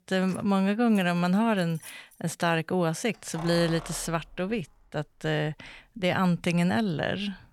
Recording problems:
household noises; noticeable; throughout; 20 dB below the speech

